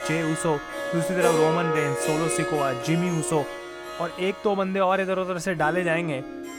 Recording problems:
background music; loud; throughout; 4 dB below the speech

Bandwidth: 18.5 kHz